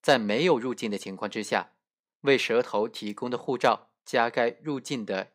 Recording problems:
none

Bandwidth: 15.5 kHz